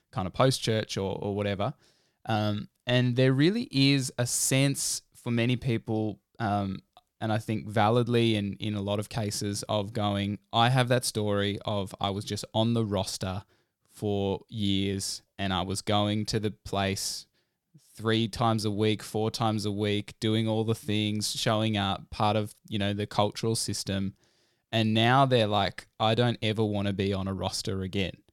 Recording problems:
none

